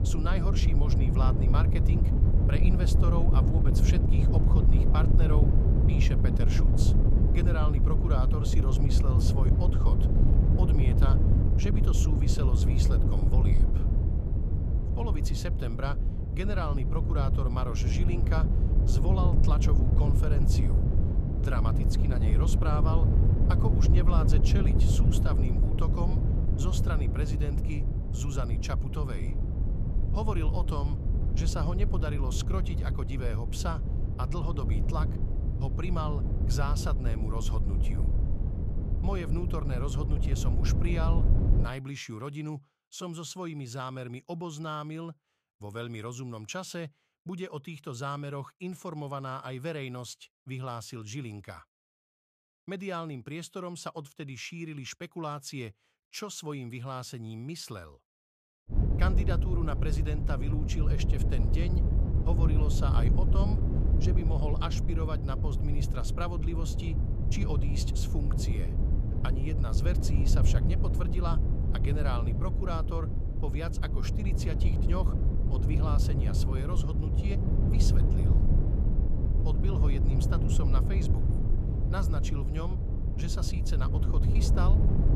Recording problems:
wind noise on the microphone; heavy; until 42 s and from 59 s on; 2 dB below the speech

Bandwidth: 14.5 kHz